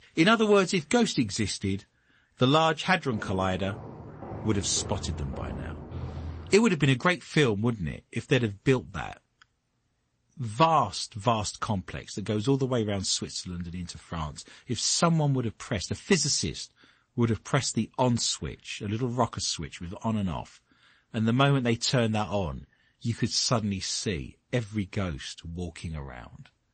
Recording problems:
garbled, watery; slightly; nothing above 8 kHz
footsteps; noticeable; from 3 to 6.5 s; peak 10 dB below the speech

